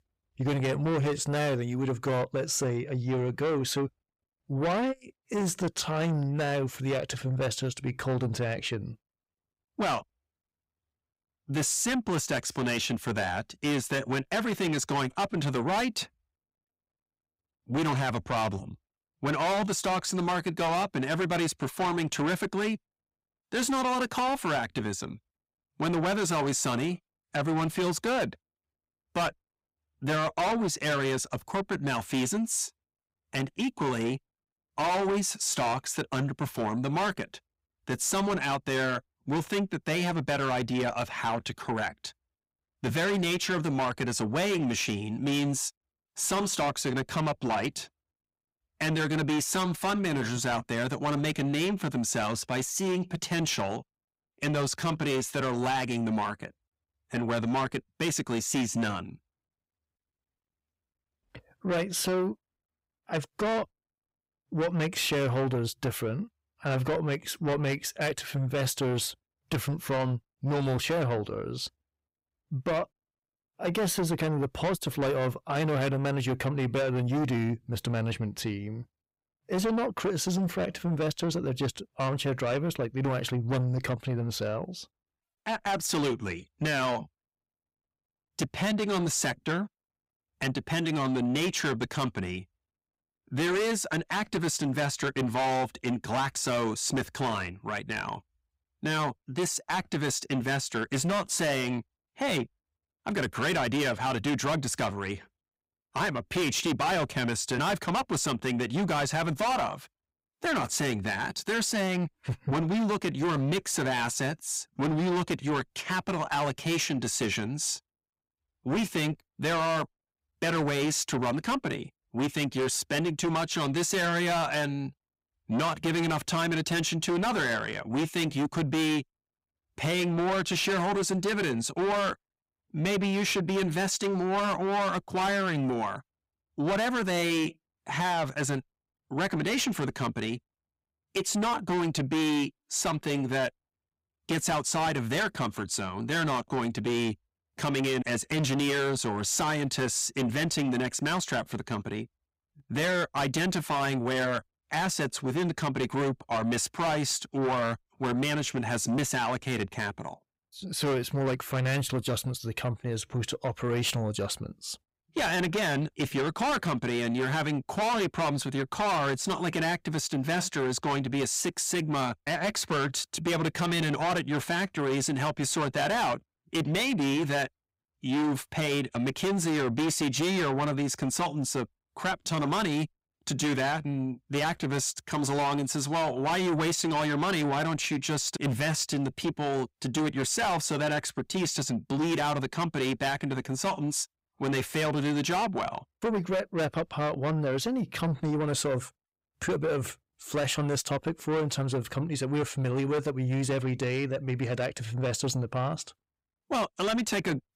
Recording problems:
distortion; heavy; 6 dB below the speech

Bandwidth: 15.5 kHz